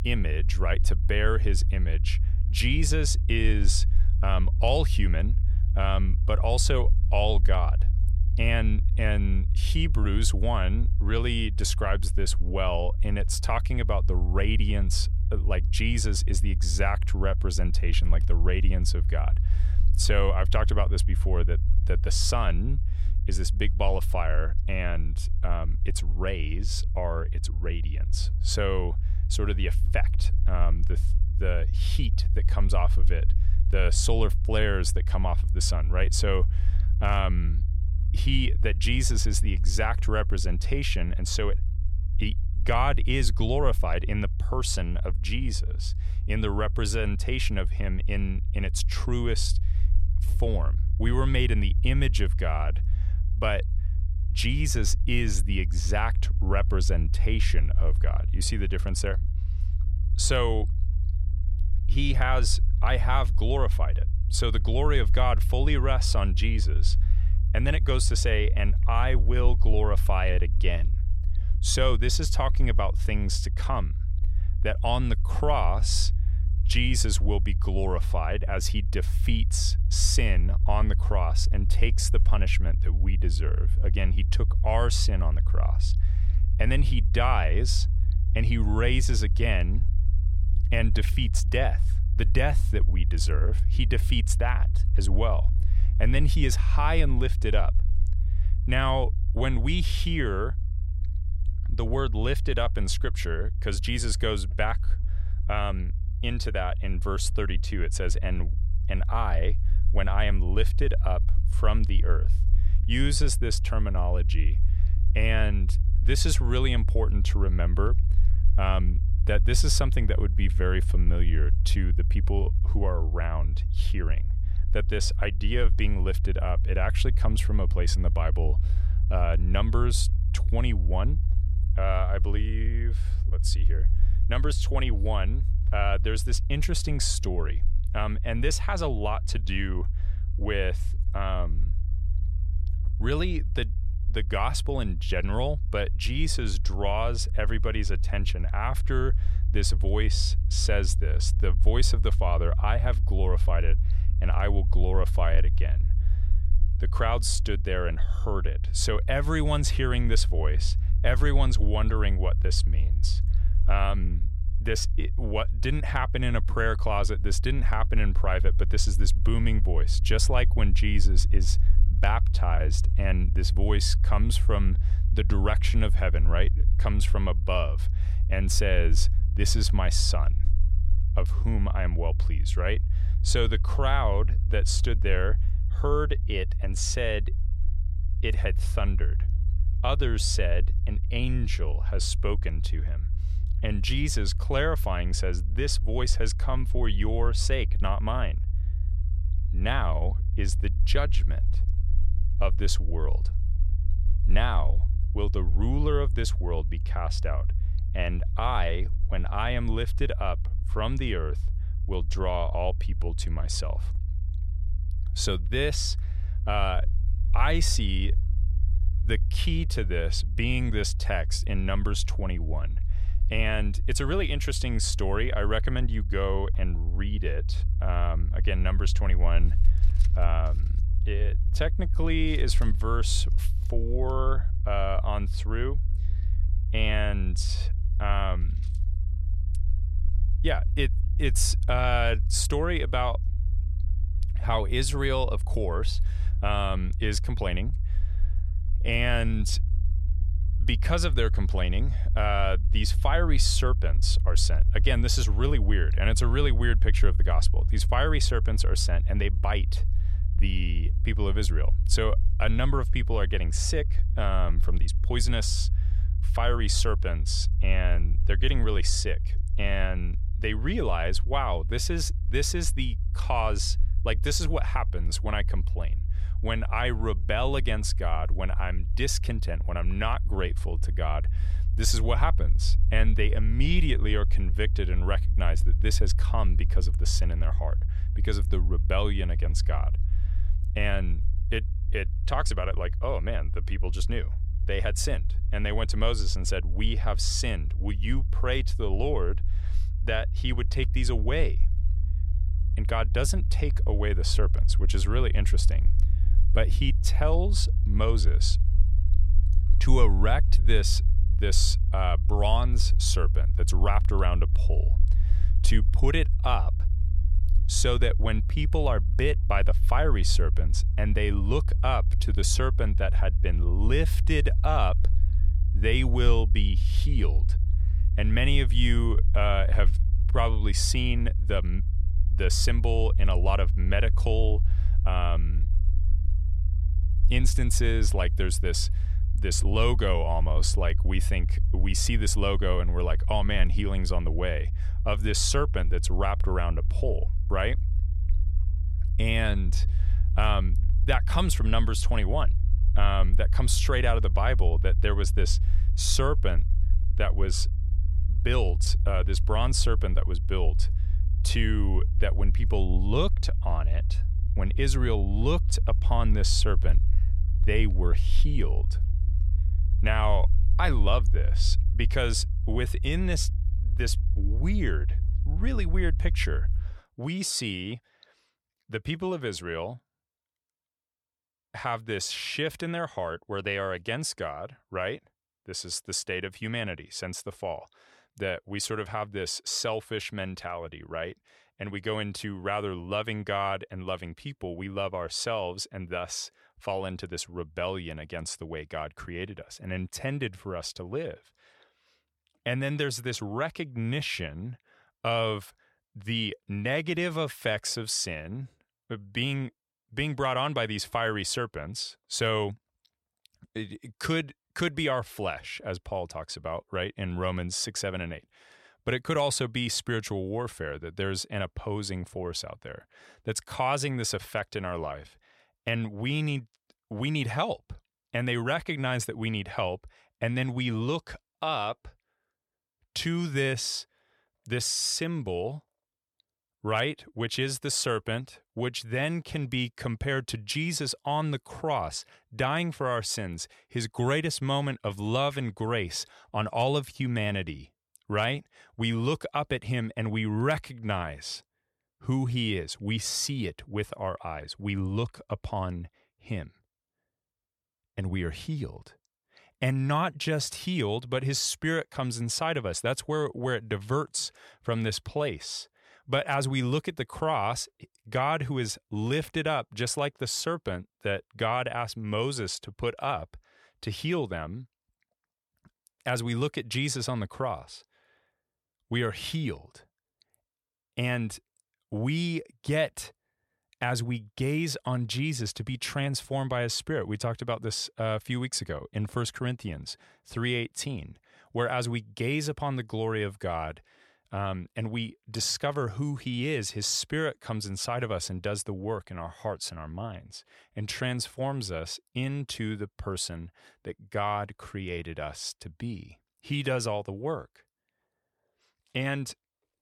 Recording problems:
low rumble; noticeable; until 6:17; 15 dB below the speech

